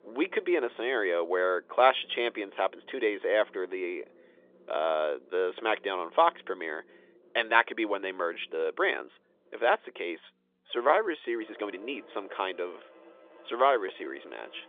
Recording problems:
phone-call audio; nothing above 3.5 kHz
background music; faint; throughout; 25 dB below the speech
uneven, jittery; strongly; from 1.5 to 14 s

